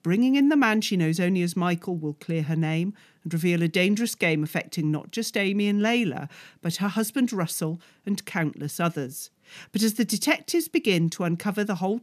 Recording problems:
none

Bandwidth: 14.5 kHz